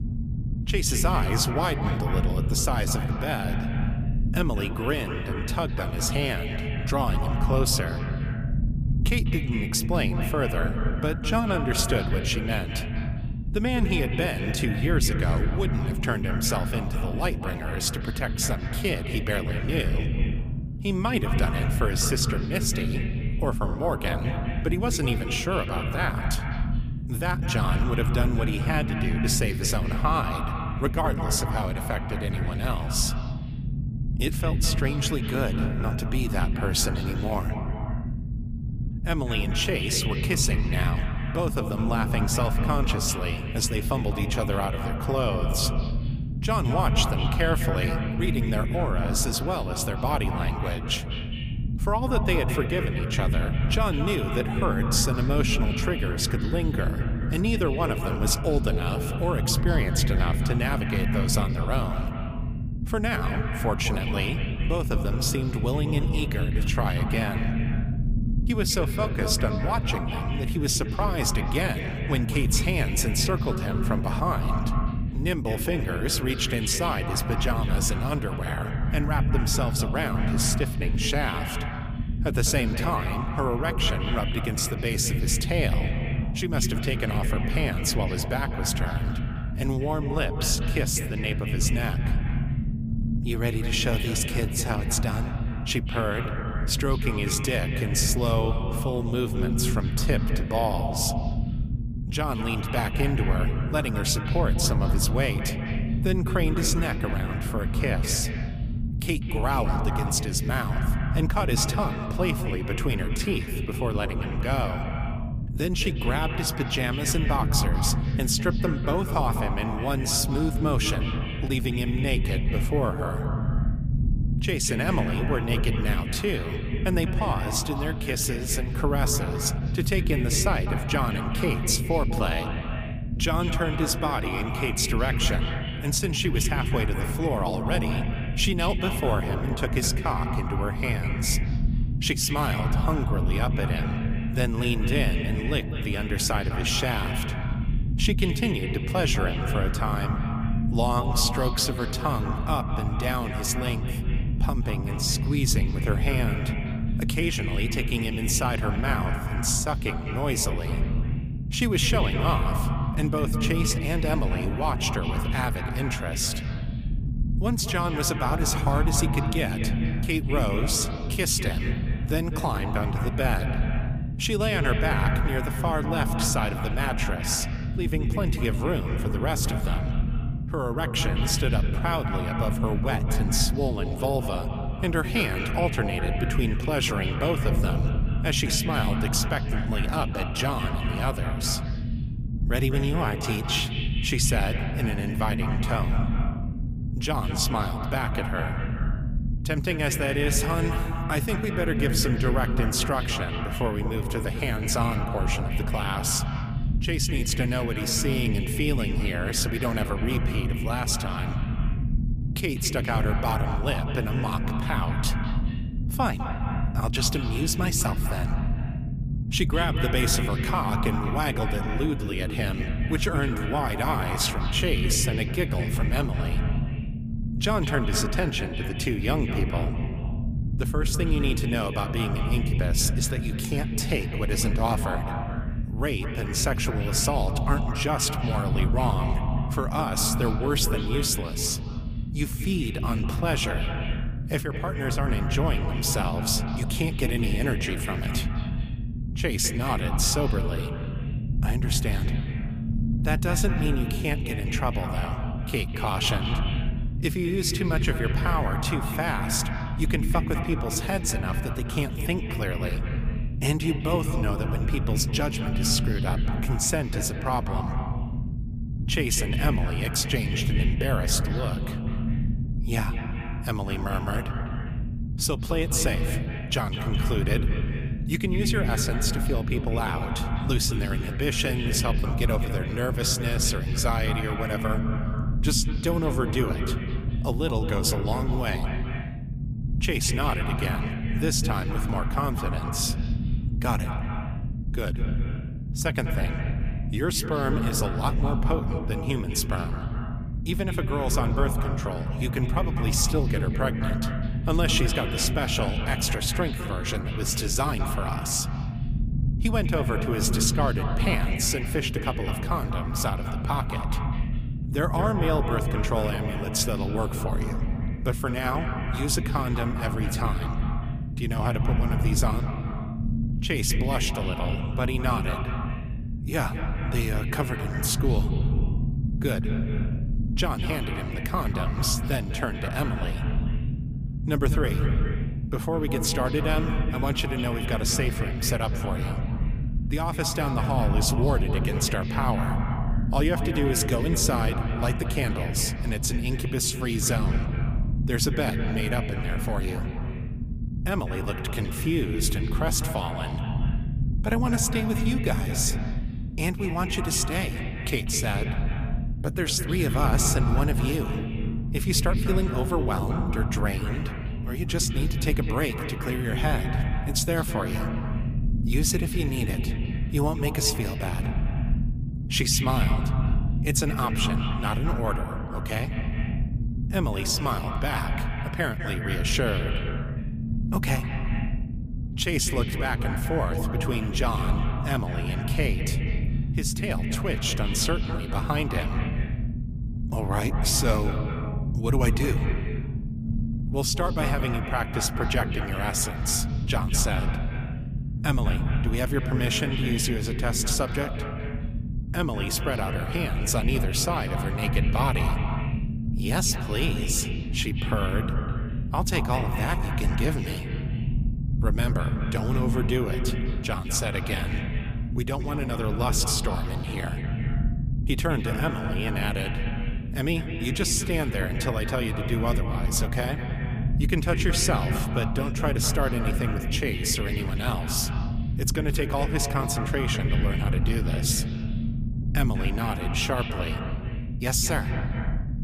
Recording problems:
echo of what is said; strong; throughout; 200 ms later, 9 dB below the speech
low rumble; noticeable; throughout; 10 dB below the speech

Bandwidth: 15 kHz